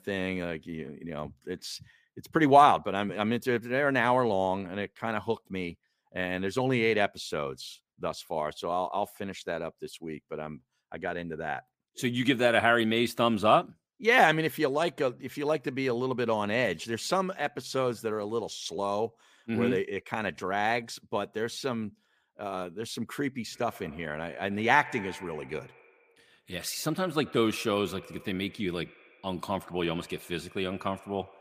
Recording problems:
echo of what is said; faint; from 24 s on; 80 ms later, 20 dB below the speech

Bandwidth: 15 kHz